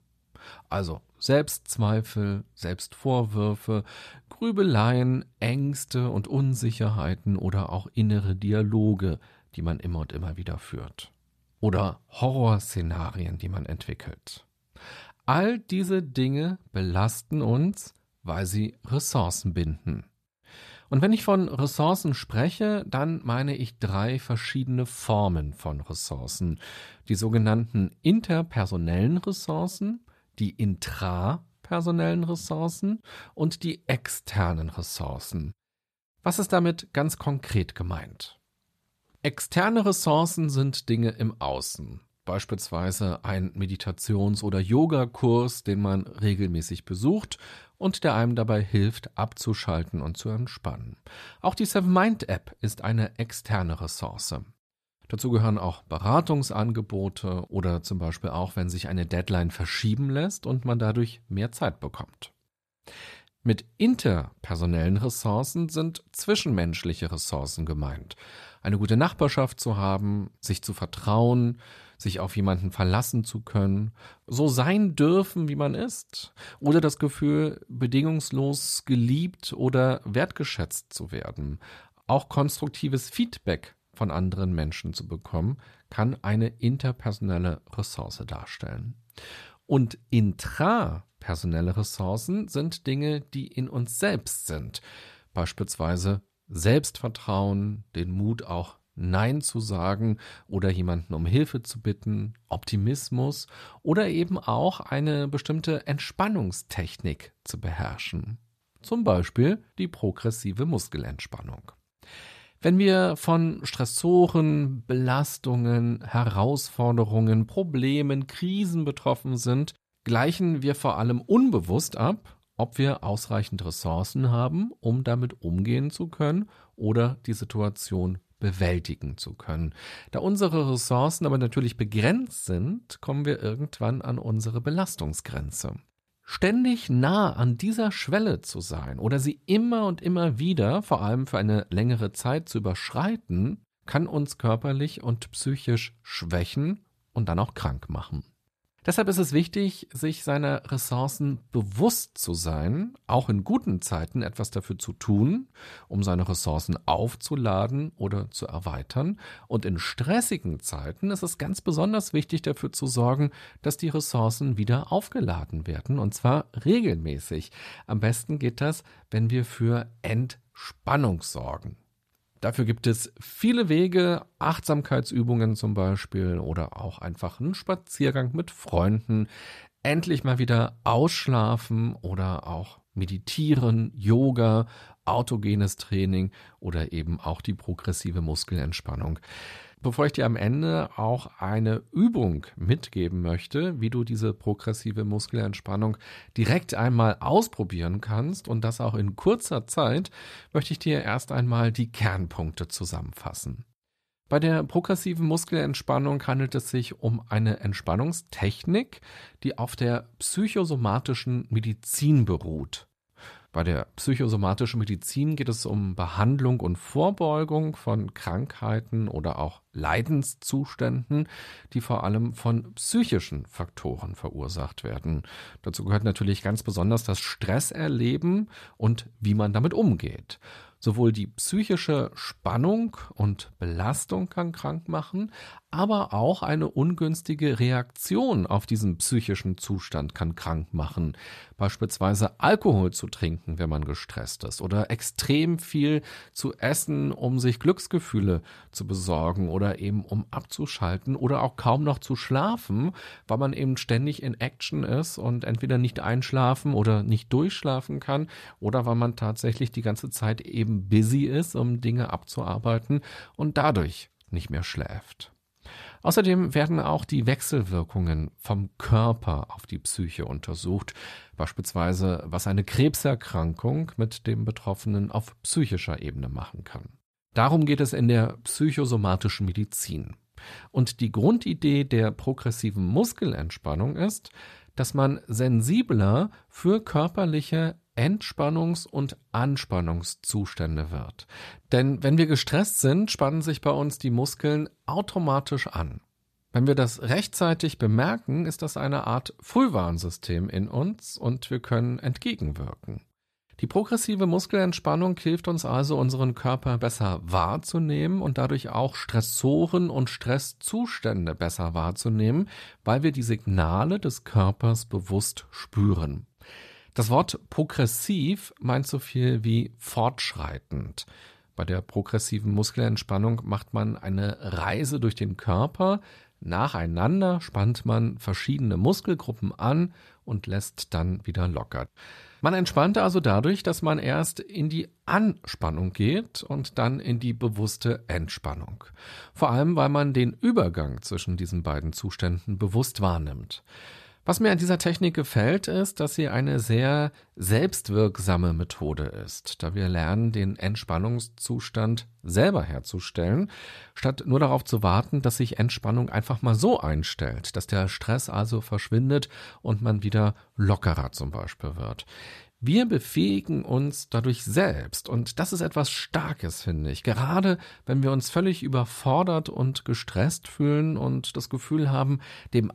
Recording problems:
none

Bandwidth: 14 kHz